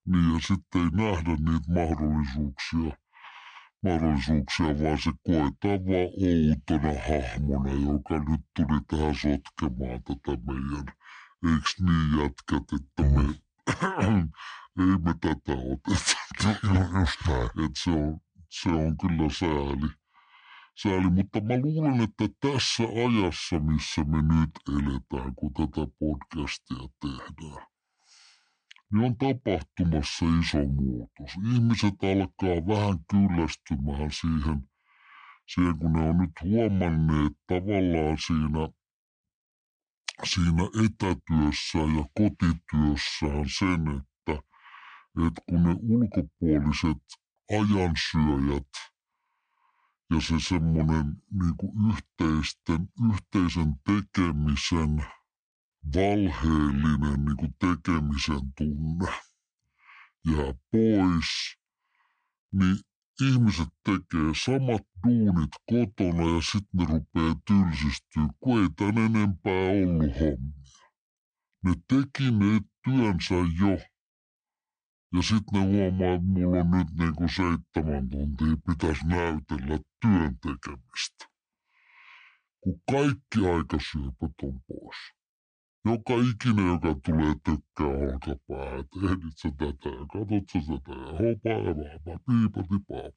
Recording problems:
wrong speed and pitch; too slow and too low; 0.7 times normal speed

